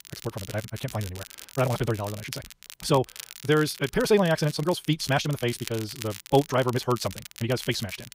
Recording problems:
wrong speed, natural pitch; too fast; 1.8 times normal speed
crackle, like an old record; noticeable; 15 dB below the speech

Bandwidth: 15.5 kHz